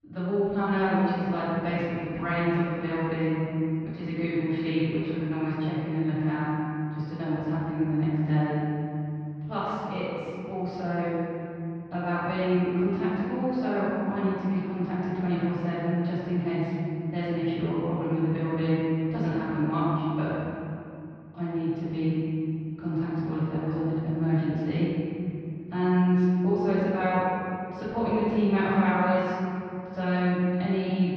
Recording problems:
room echo; strong; dies away in 2.6 s
off-mic speech; far
muffled; slightly; fading above 4 kHz

